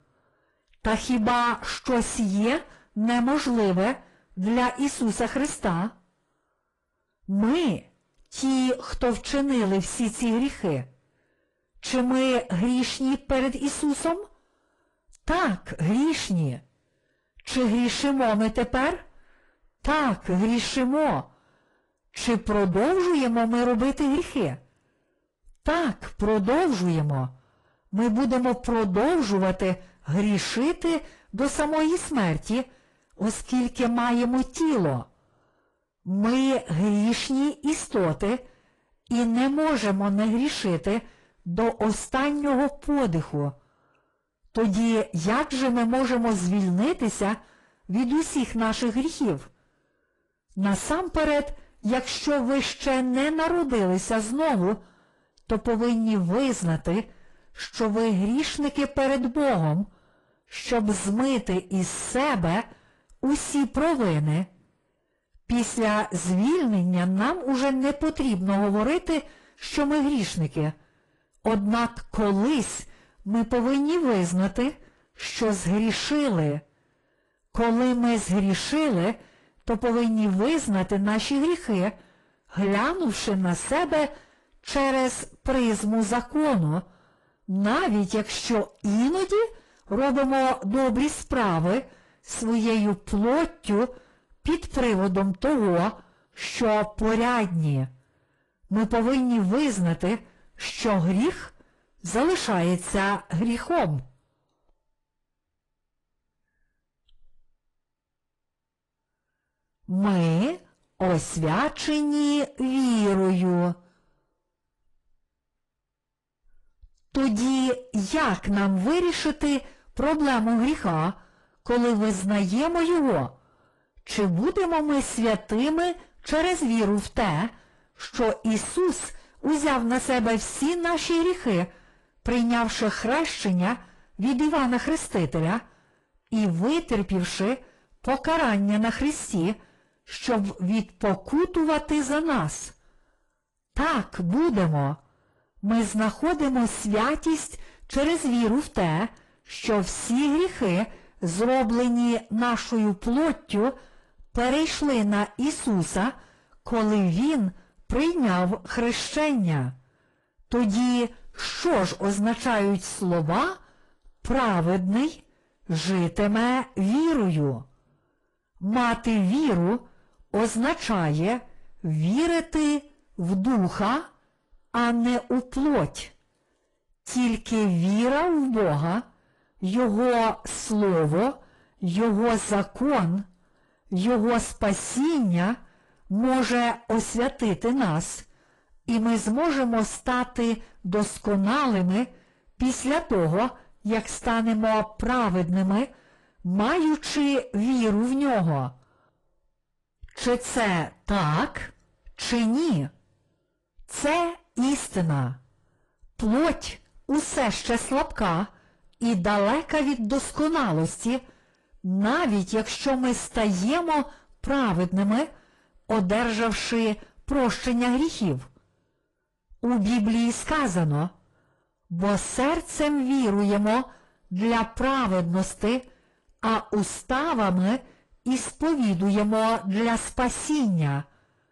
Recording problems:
distortion; heavy; 7 dB below the speech
garbled, watery; slightly; nothing above 10 kHz

